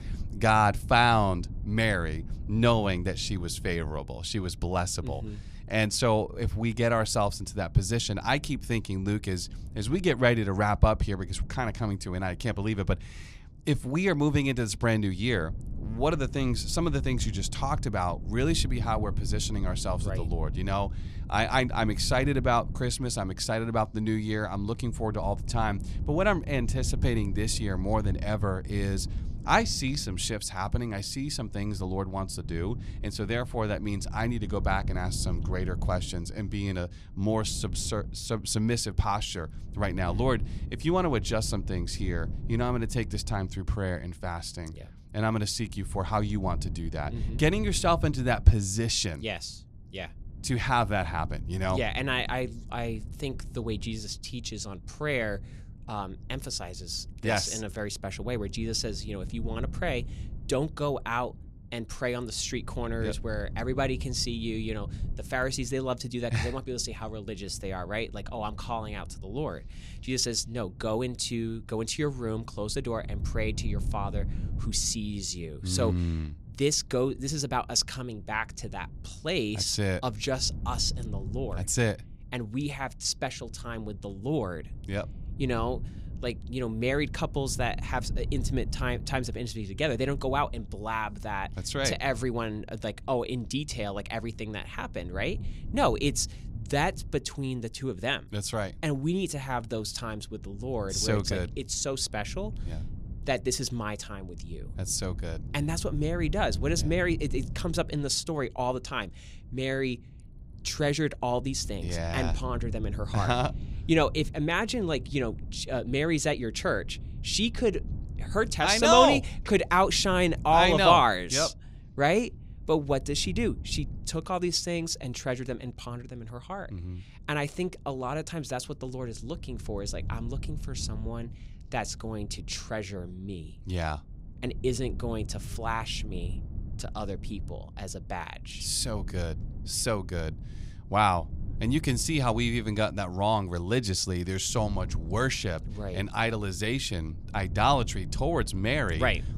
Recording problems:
wind noise on the microphone; occasional gusts; 25 dB below the speech

